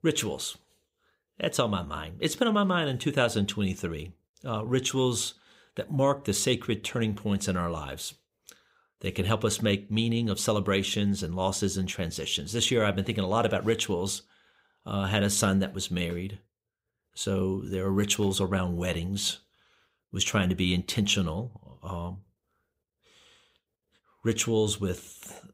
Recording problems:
none

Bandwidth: 15.5 kHz